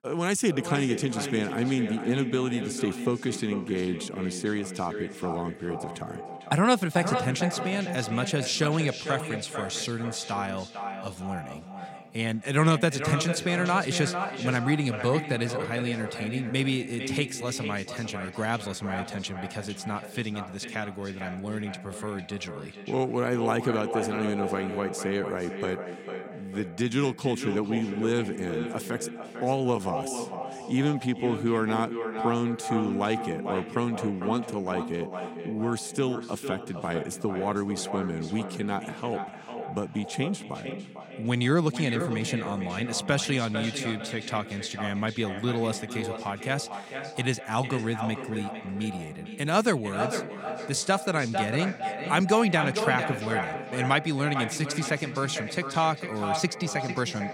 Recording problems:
echo of what is said; strong; throughout; 450 ms later, 7 dB below the speech

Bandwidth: 16.5 kHz